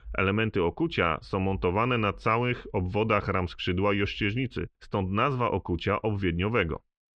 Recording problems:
muffled; very; fading above 3.5 kHz

